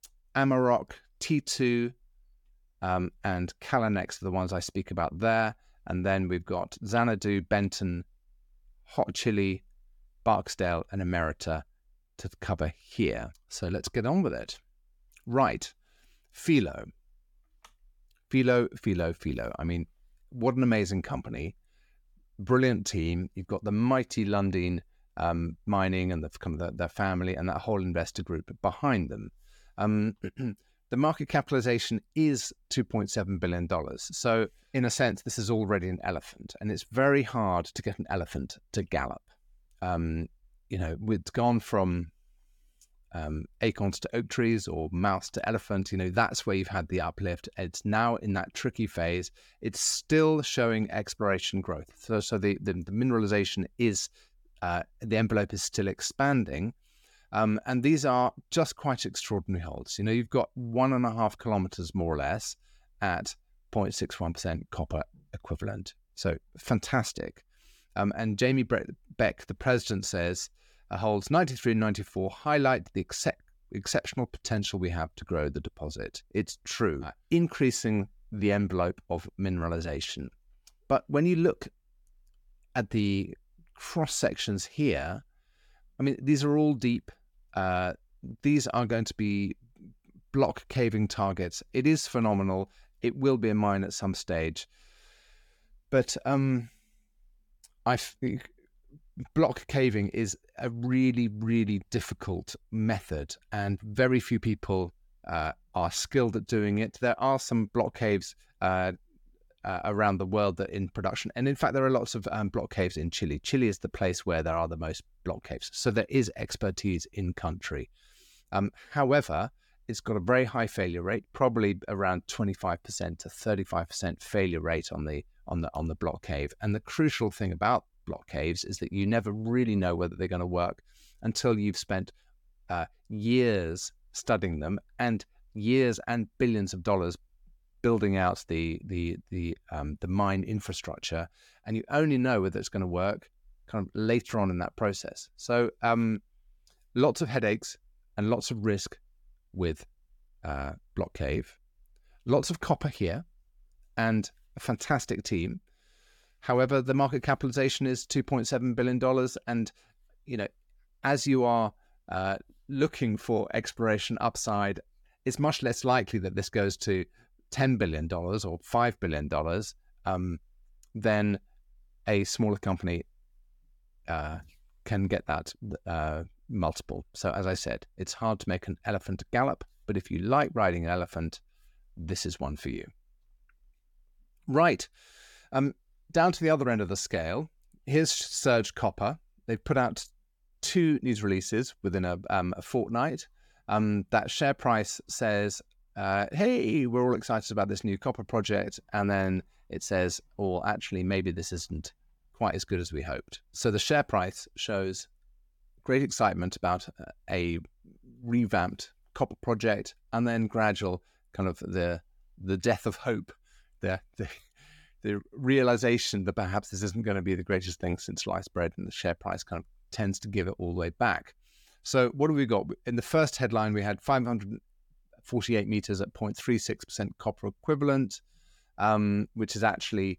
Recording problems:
none

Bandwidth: 18 kHz